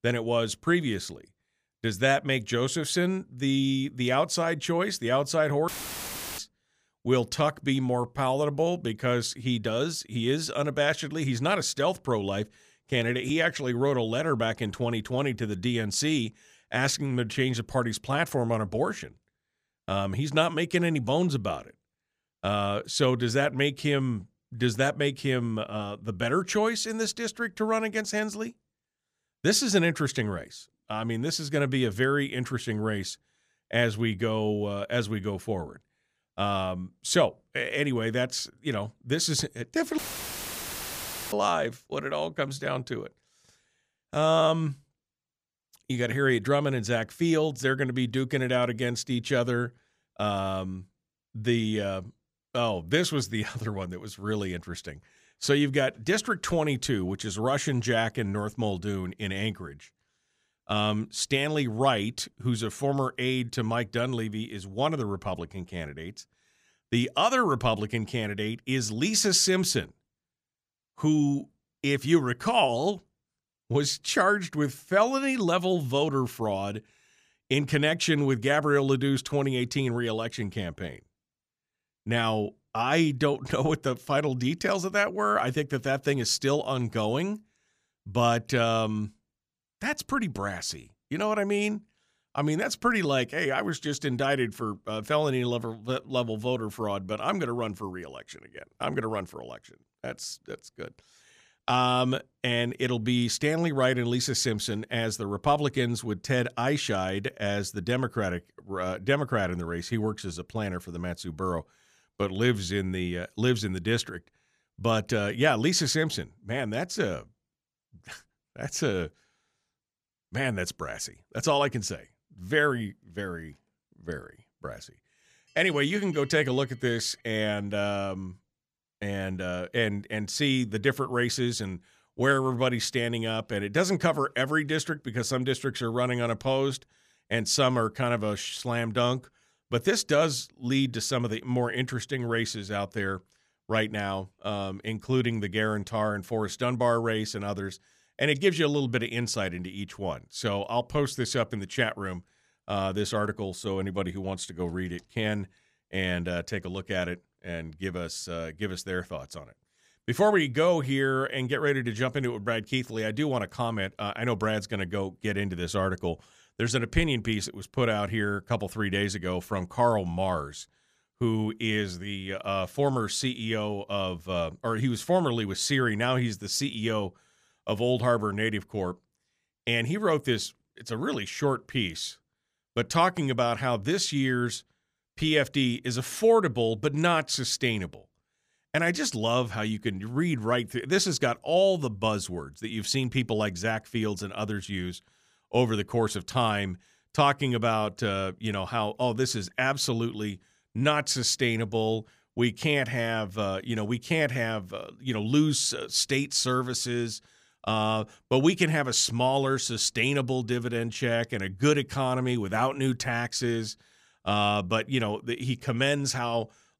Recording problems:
audio cutting out; filled with static; at 5.5 s for 0.5 s and at 40 s for 1.5 s

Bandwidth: 15 kHz